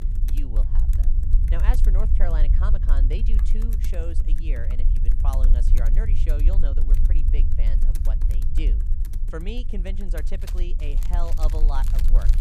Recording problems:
household noises; loud; throughout; 9 dB below the speech
low rumble; loud; throughout; 6 dB below the speech

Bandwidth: 15 kHz